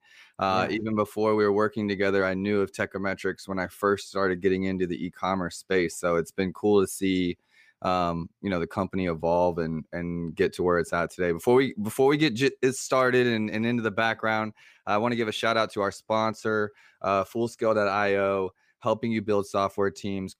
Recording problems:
none

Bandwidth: 15 kHz